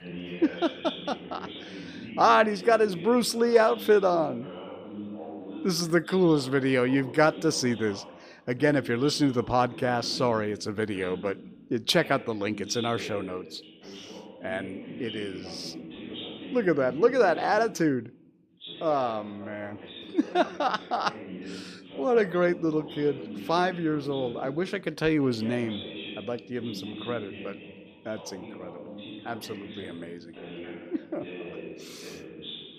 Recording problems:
voice in the background; noticeable; throughout; 15 dB below the speech

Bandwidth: 14.5 kHz